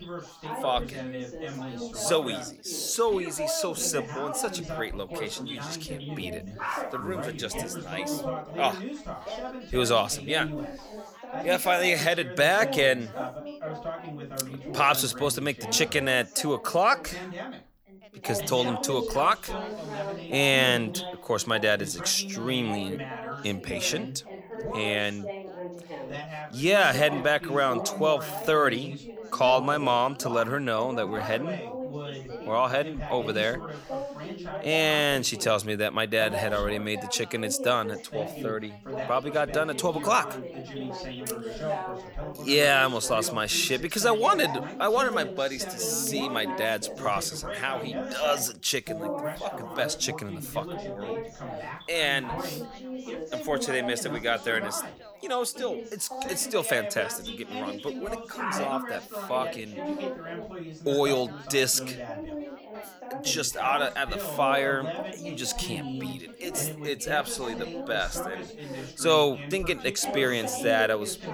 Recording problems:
background chatter; loud; throughout; 4 voices, 9 dB below the speech

